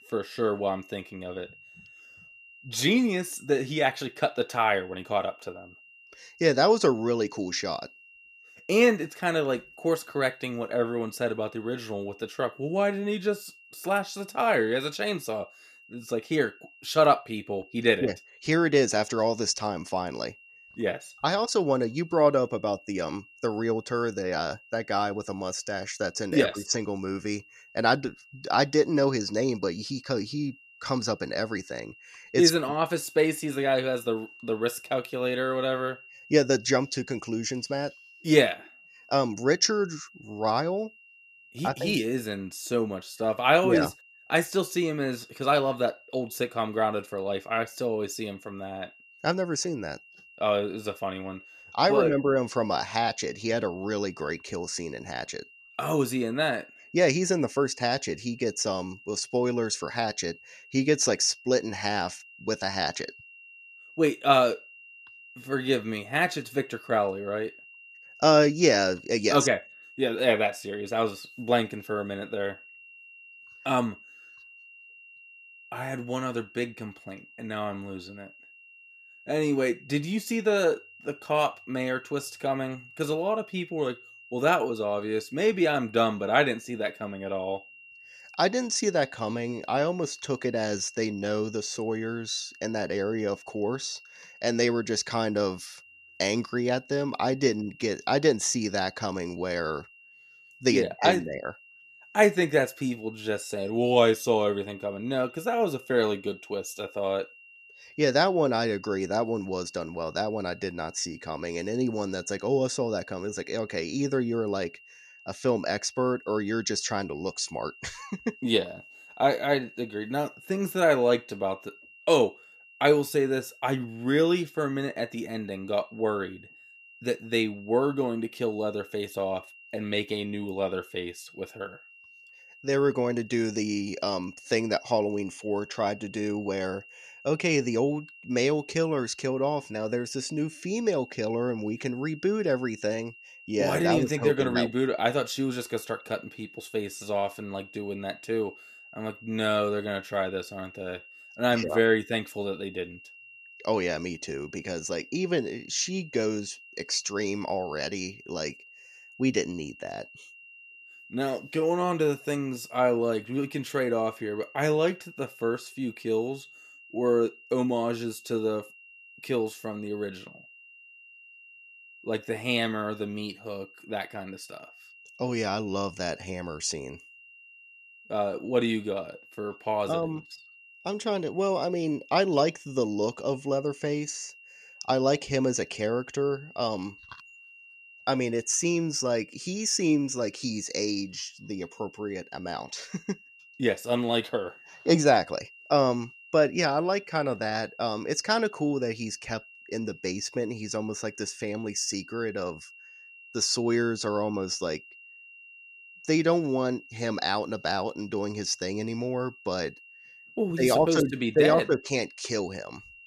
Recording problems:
high-pitched whine; faint; throughout; 3 kHz, 20 dB below the speech

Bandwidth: 14.5 kHz